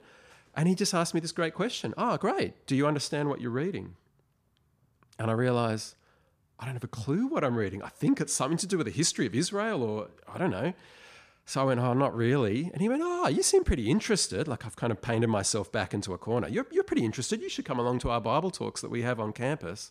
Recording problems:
none

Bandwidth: 15 kHz